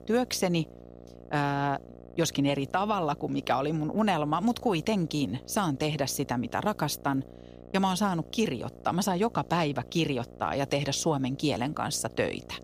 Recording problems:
electrical hum; faint; throughout; 60 Hz, 20 dB below the speech

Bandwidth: 15 kHz